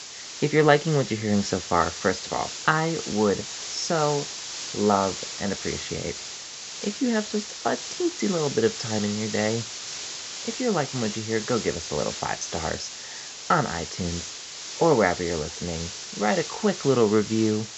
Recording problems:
high frequencies cut off; noticeable; nothing above 7.5 kHz
hiss; loud; throughout; 8 dB below the speech

